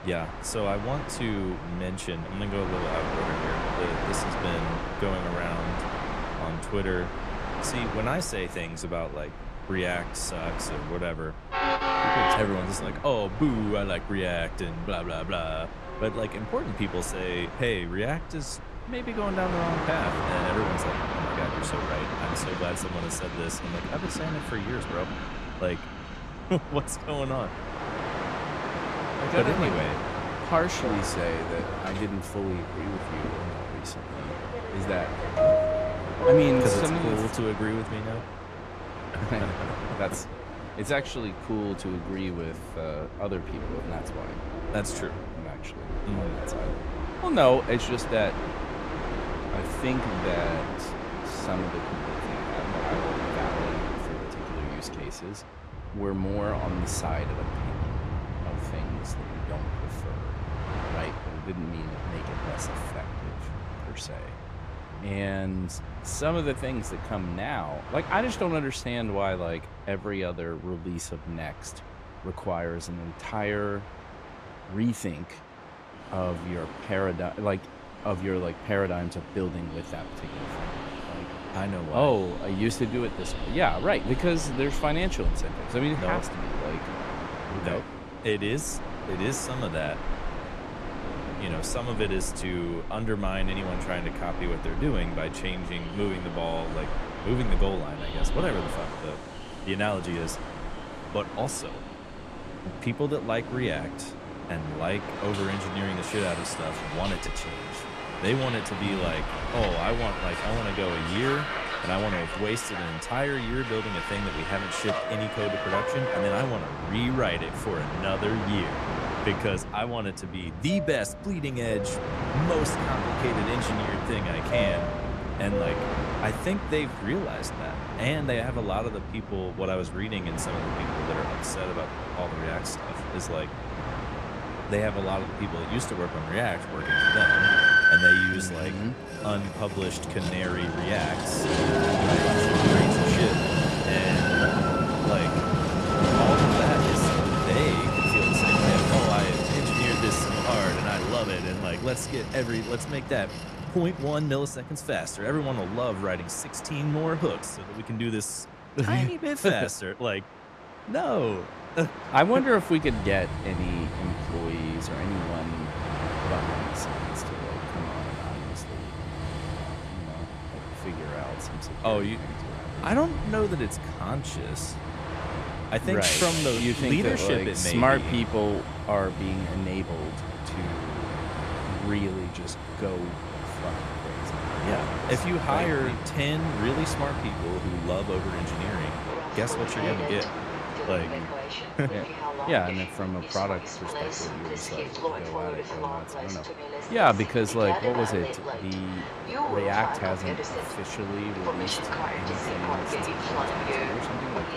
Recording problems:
train or aircraft noise; loud; throughout; as loud as the speech

